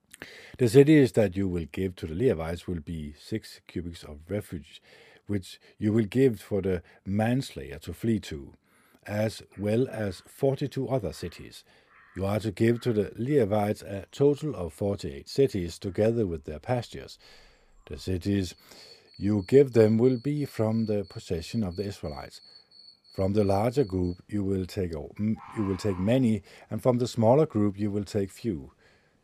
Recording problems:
animal sounds; faint; from 9.5 s on; 25 dB below the speech

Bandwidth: 15 kHz